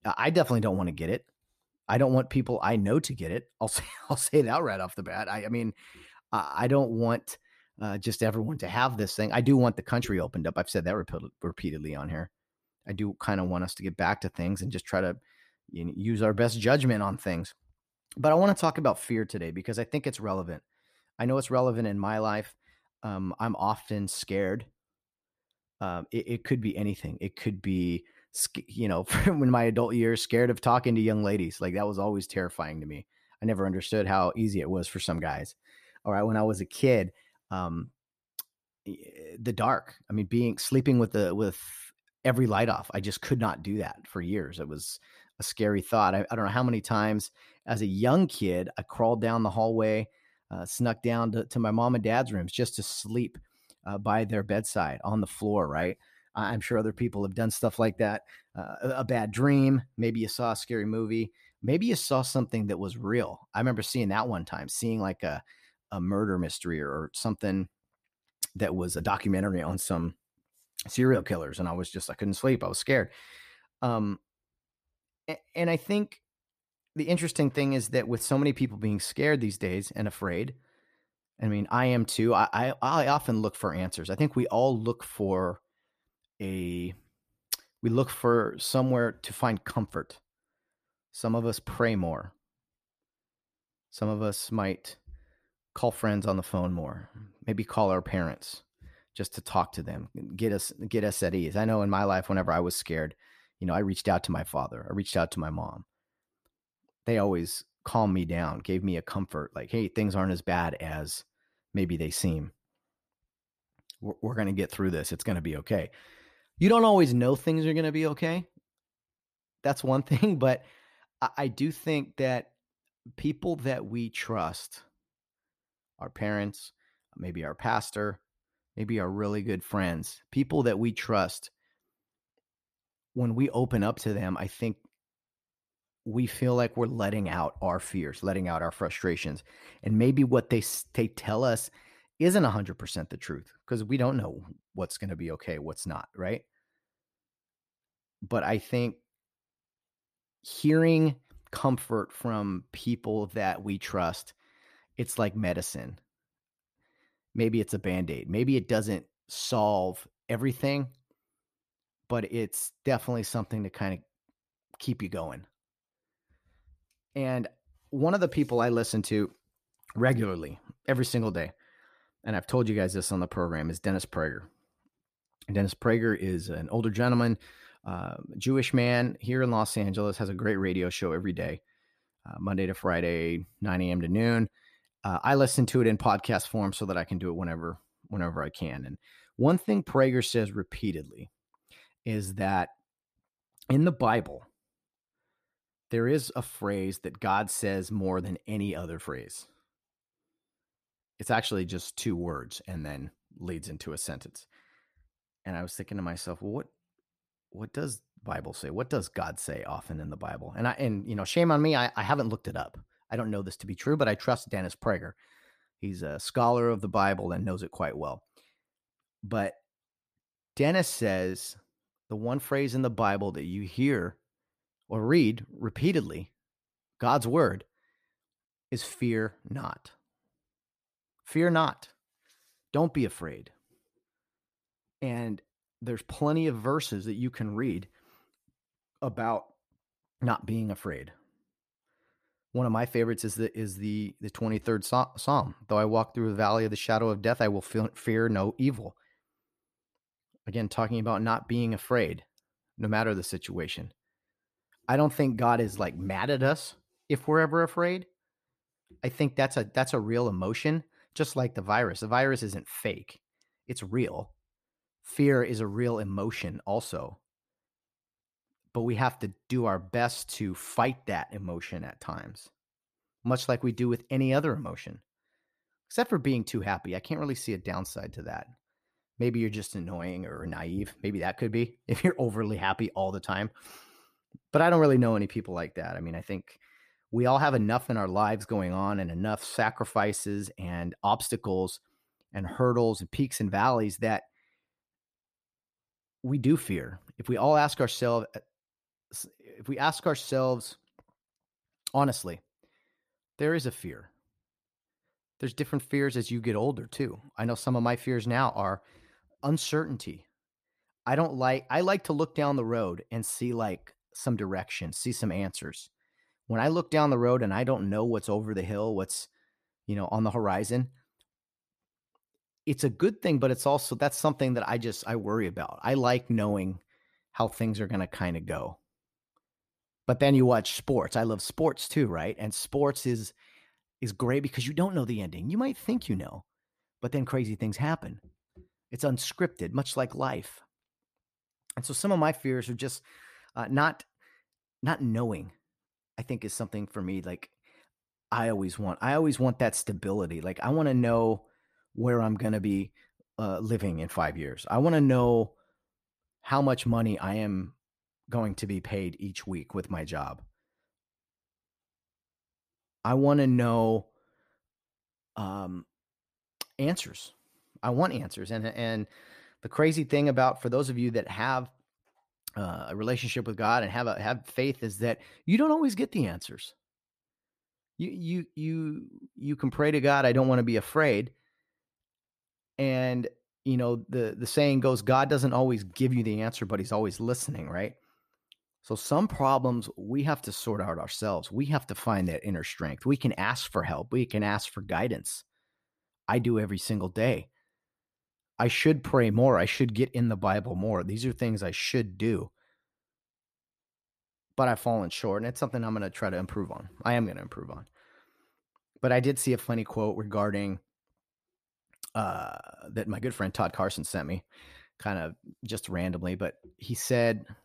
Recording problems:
none

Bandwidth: 14.5 kHz